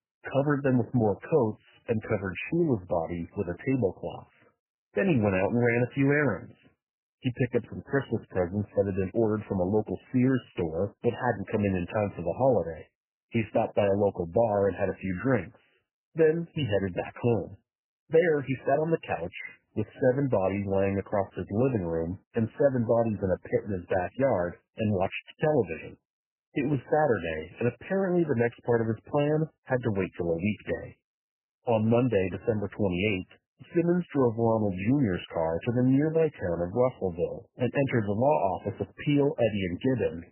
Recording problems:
garbled, watery; badly; nothing above 3 kHz

